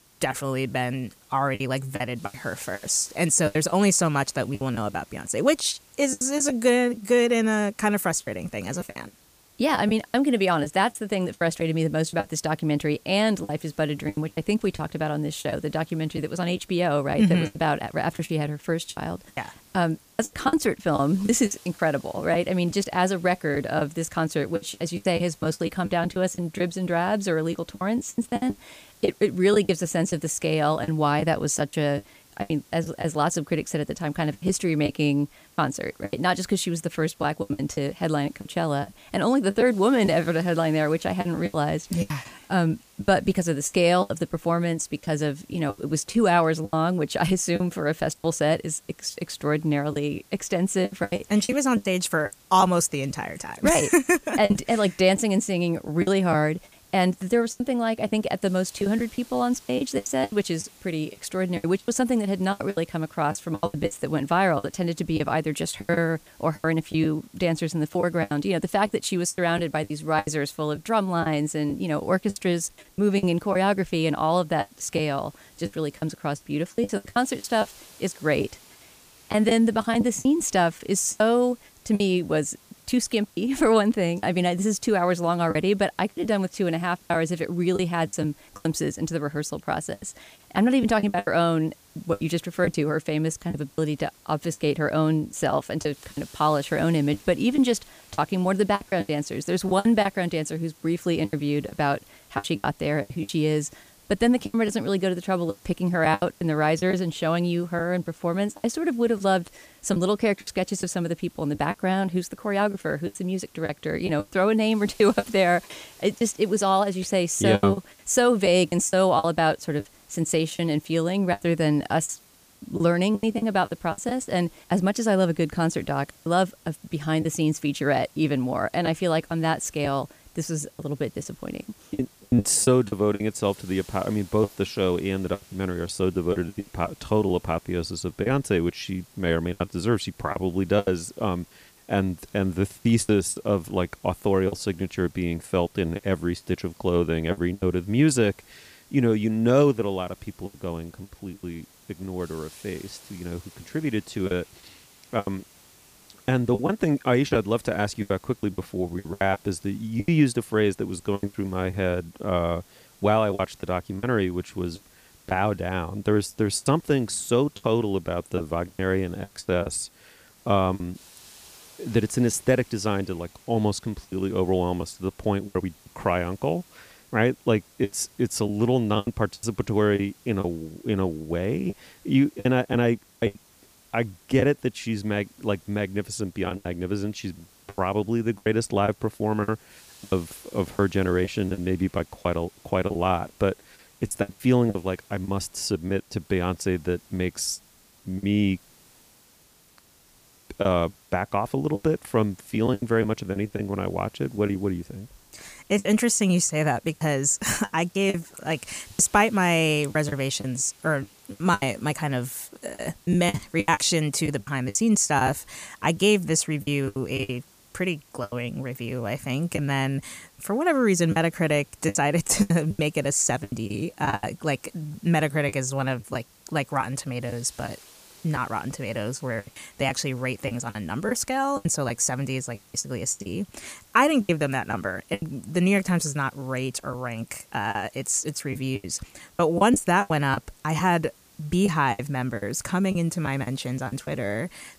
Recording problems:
hiss; faint; throughout; 25 dB below the speech
choppy; very; 10% of the speech affected

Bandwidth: 15 kHz